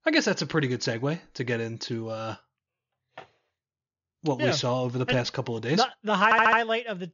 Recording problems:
high frequencies cut off; noticeable; nothing above 7 kHz
audio stuttering; at 6 s

